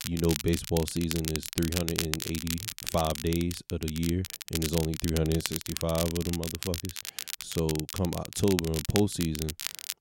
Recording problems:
crackle, like an old record; loud; 5 dB below the speech

